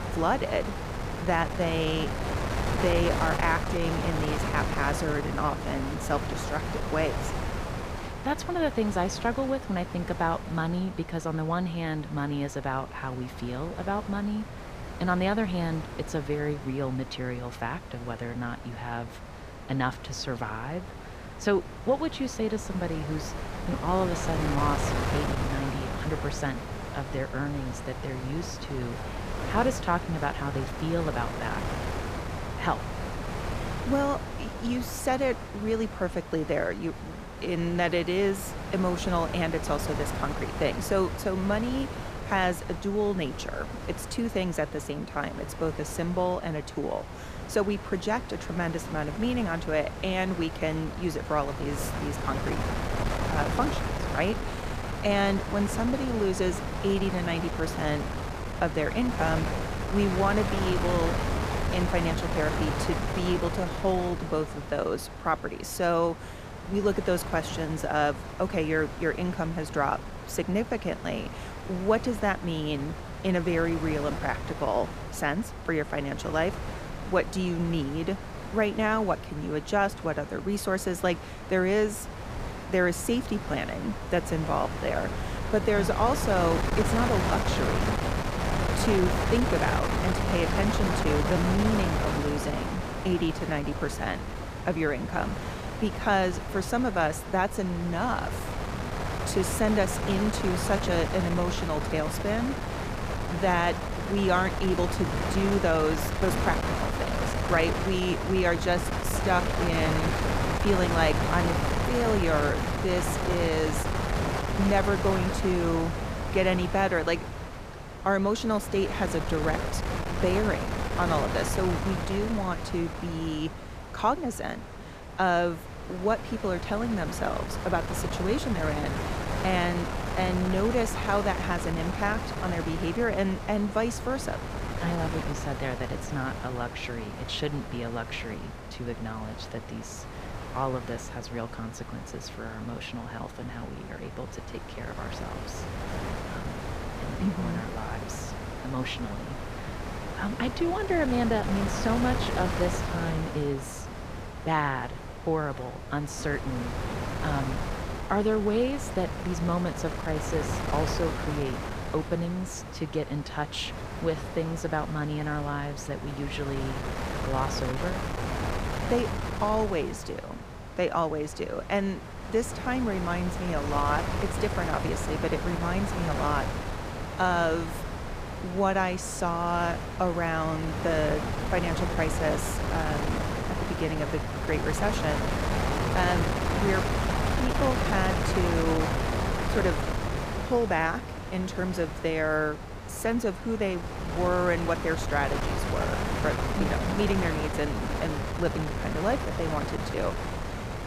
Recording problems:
wind noise on the microphone; heavy; 4 dB below the speech

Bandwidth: 15 kHz